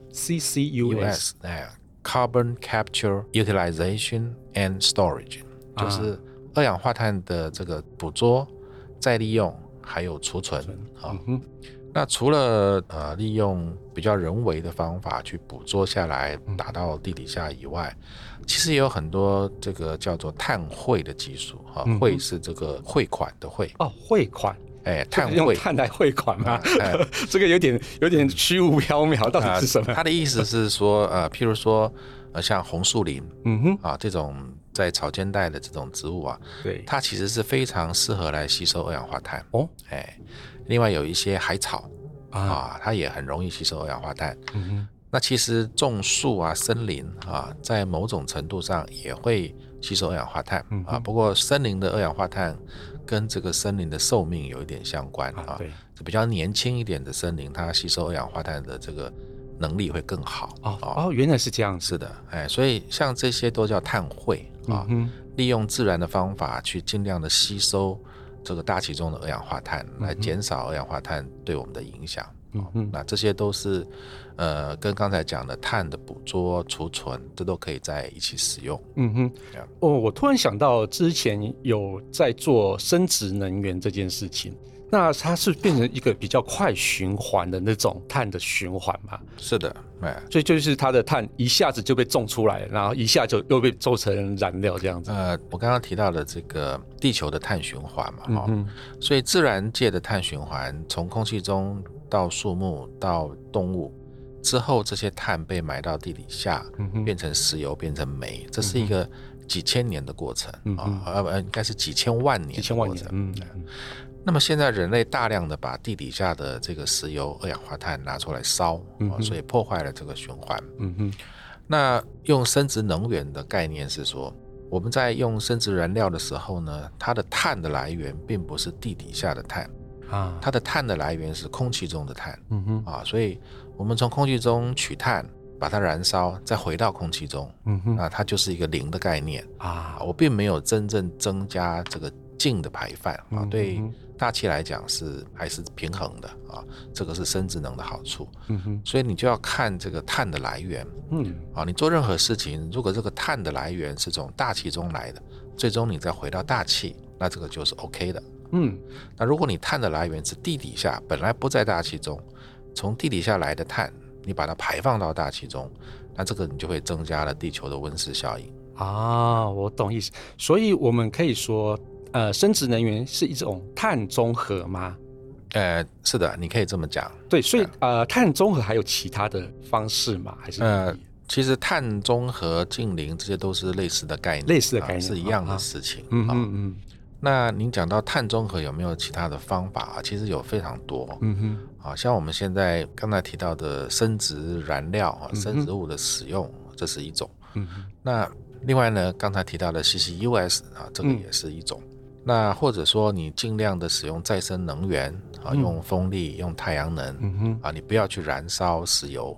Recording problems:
low rumble; faint; throughout; 25 dB below the speech

